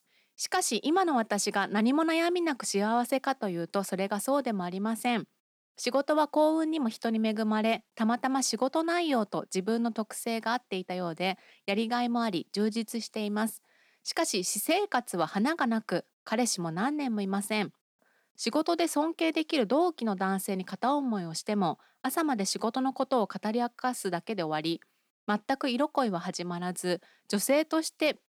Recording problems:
none

